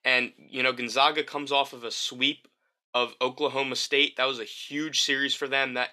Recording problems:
thin; somewhat; fading below 400 Hz

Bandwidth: 13.5 kHz